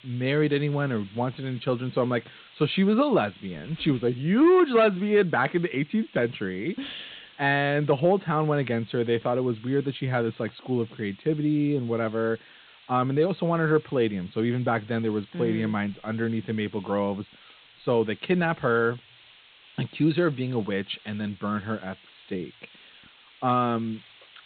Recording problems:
high frequencies cut off; severe; nothing above 4 kHz
hiss; faint; throughout; 25 dB below the speech

